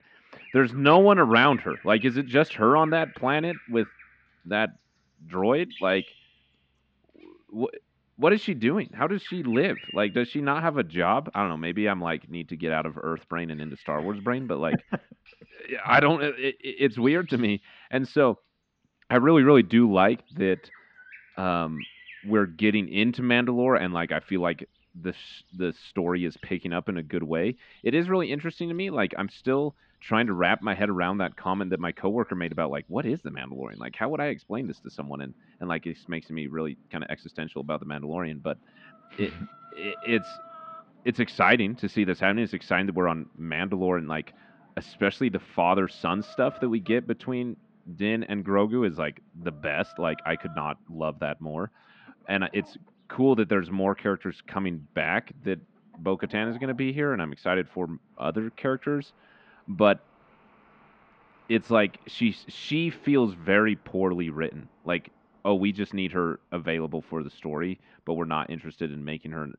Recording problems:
muffled; slightly; fading above 3.5 kHz
animal sounds; faint; throughout; 25 dB below the speech

